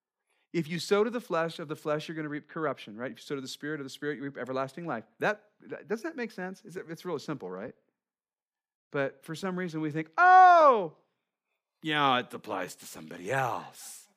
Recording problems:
none

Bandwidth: 15 kHz